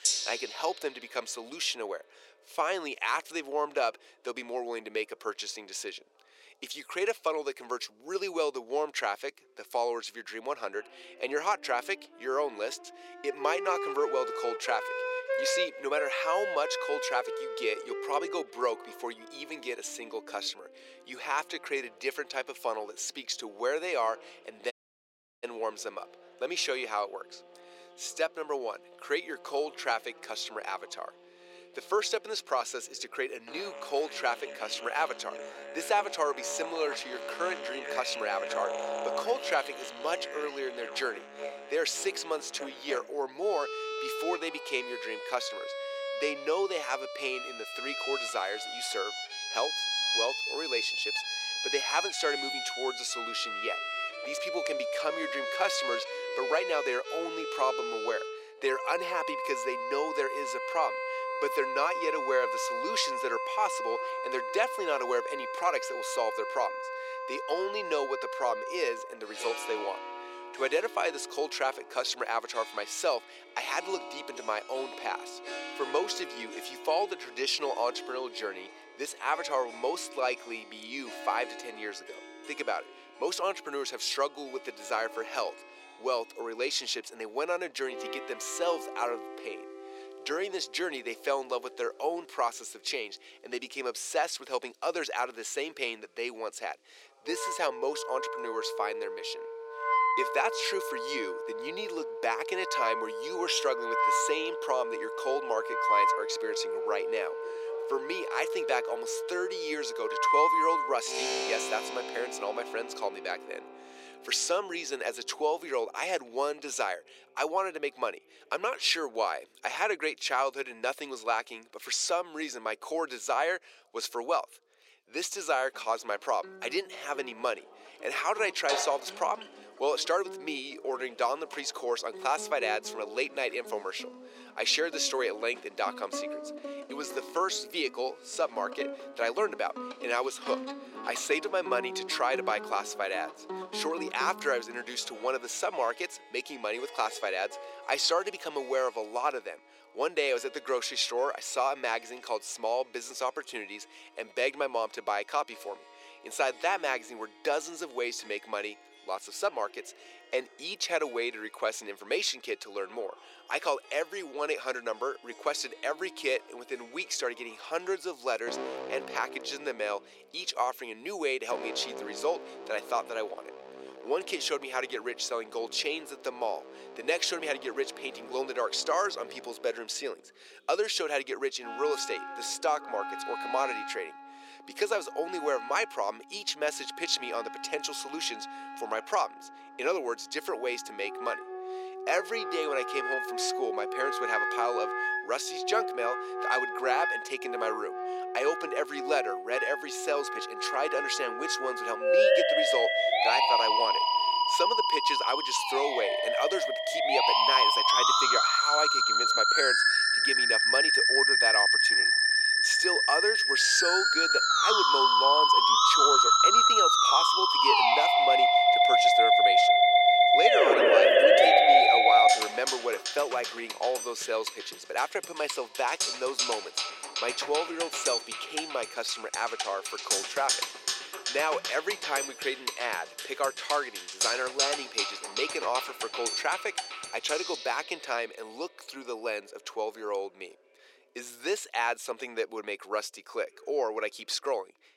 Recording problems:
thin; very; fading below 450 Hz
background music; very loud; throughout; 5 dB above the speech
voice in the background; faint; throughout; 30 dB below the speech
audio cutting out; at 25 s for 0.5 s

